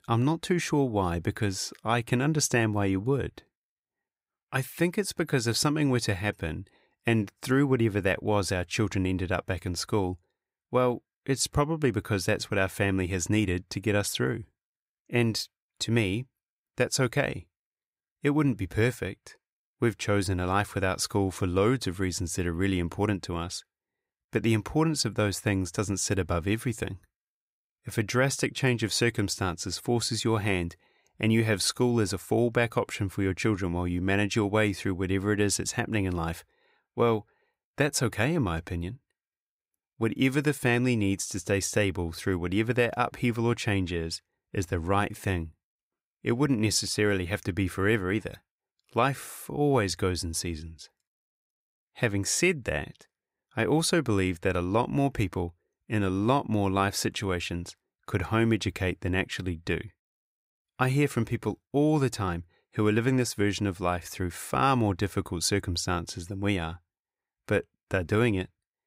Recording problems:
none

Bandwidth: 15.5 kHz